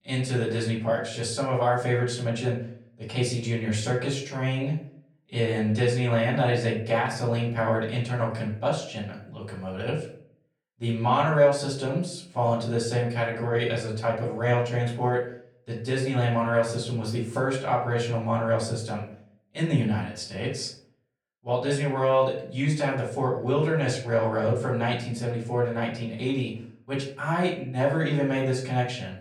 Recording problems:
off-mic speech; far
room echo; slight; dies away in 0.5 s

